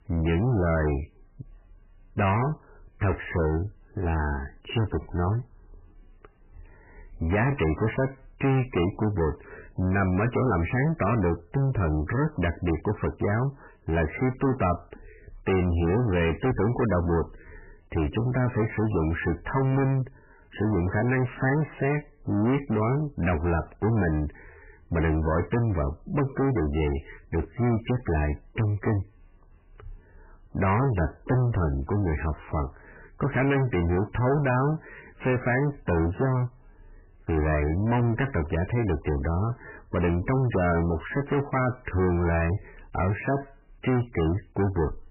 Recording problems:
distortion; heavy; 6 dB below the speech
garbled, watery; badly; nothing above 3 kHz

